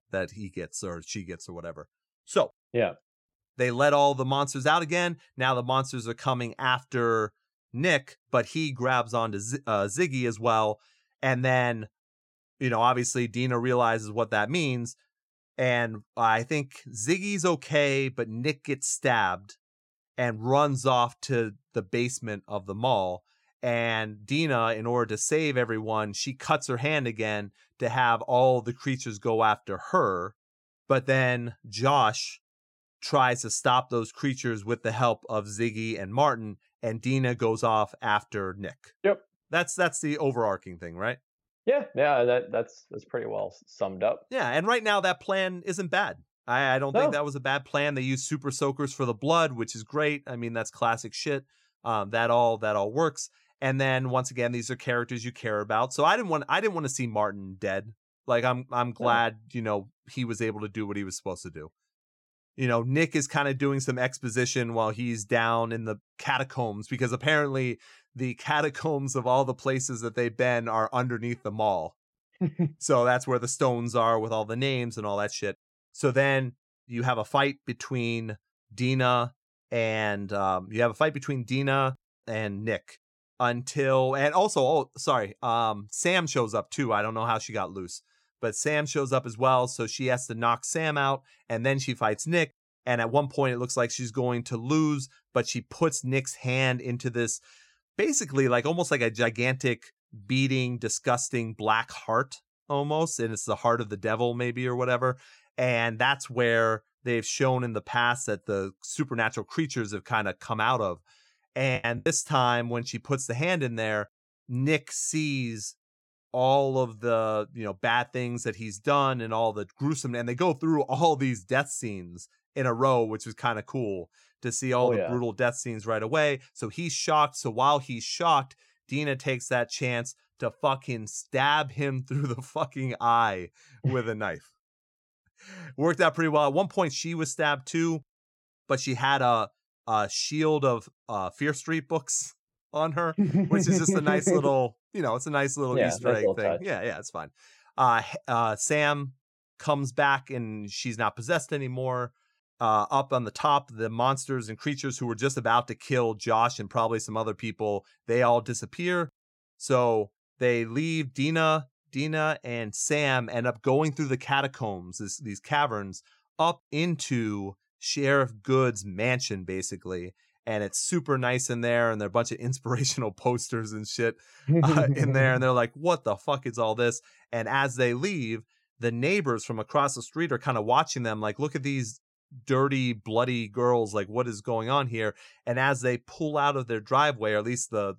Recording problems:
choppy; very; at 1:52; 16% of the speech affected

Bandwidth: 16.5 kHz